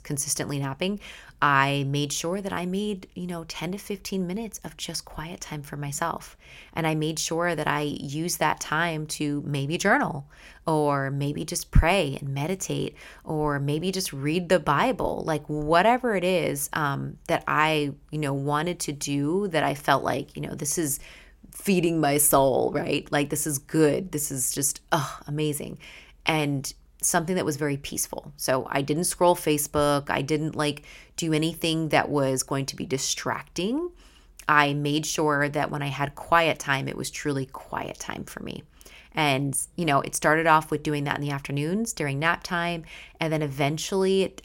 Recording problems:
none

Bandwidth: 16.5 kHz